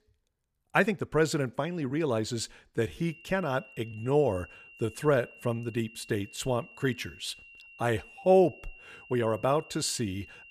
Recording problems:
high-pitched whine; faint; from 3 s on; 3 kHz, 20 dB below the speech
uneven, jittery; strongly; from 0.5 to 9.5 s

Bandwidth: 14.5 kHz